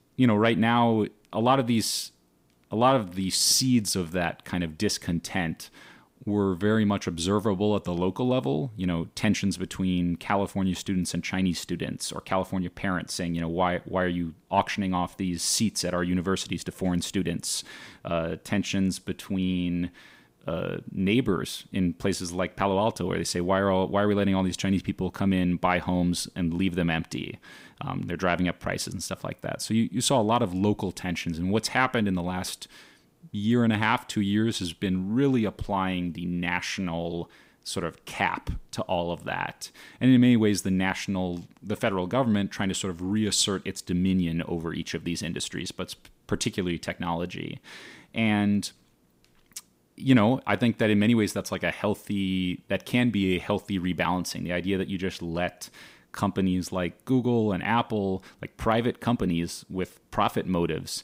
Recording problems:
none

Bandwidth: 15.5 kHz